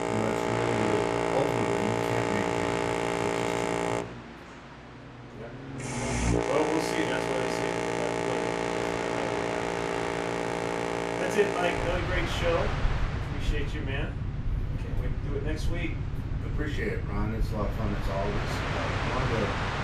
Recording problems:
off-mic speech; far
room echo; slight; dies away in 0.3 s
train or aircraft noise; very loud; throughout; 4 dB above the speech
voice in the background; faint; throughout; 20 dB below the speech

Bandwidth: 14.5 kHz